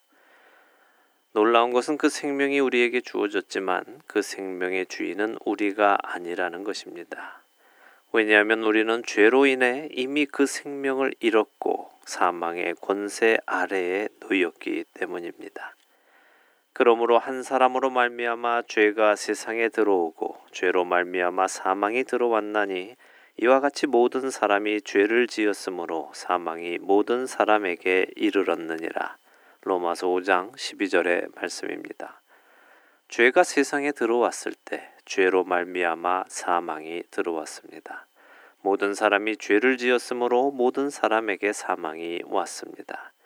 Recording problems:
thin; very; fading below 300 Hz

